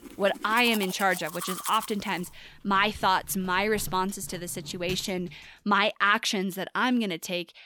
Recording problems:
household noises; noticeable; until 5.5 s; 15 dB below the speech

